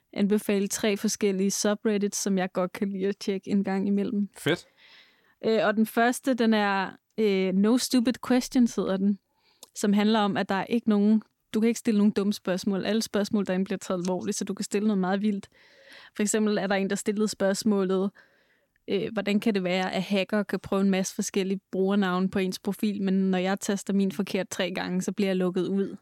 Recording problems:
none

